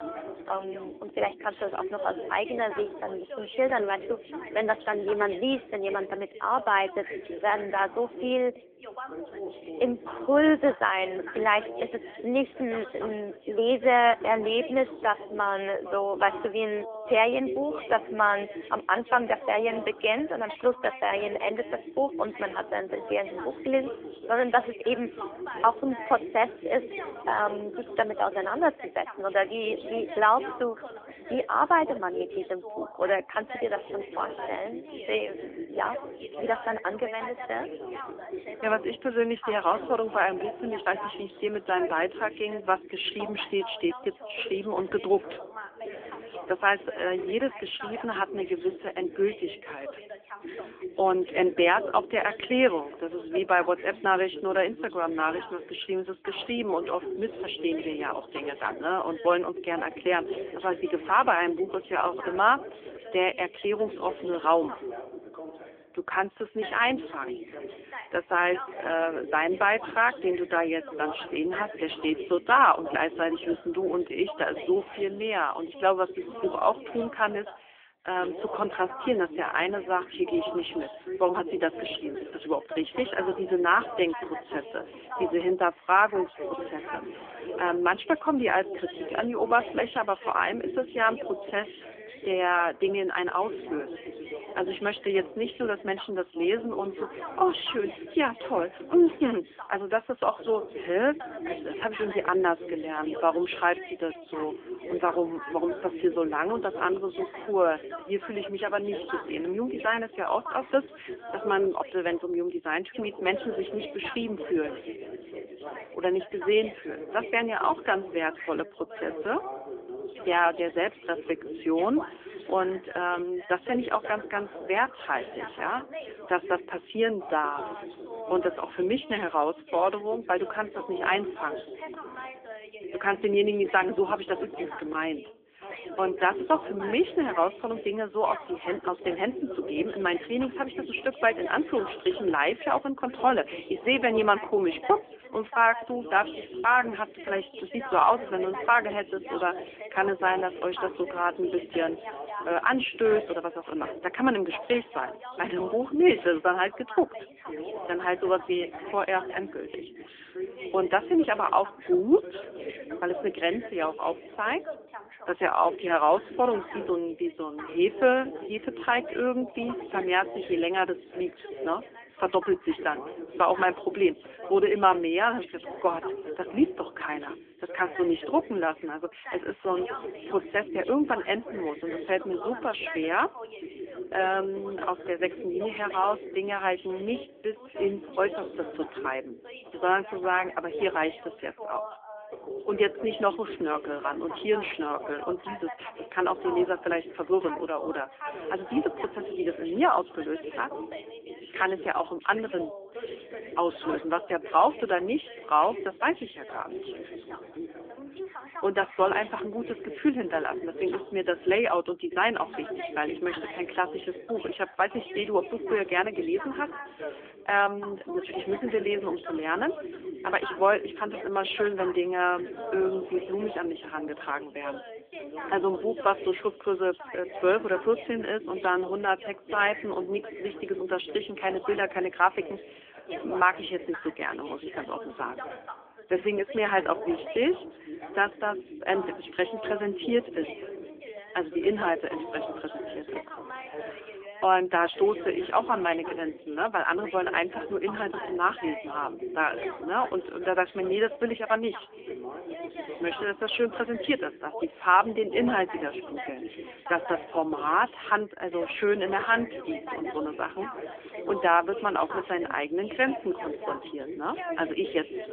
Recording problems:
phone-call audio; nothing above 3.5 kHz
background chatter; noticeable; throughout; 2 voices, 10 dB below the speech

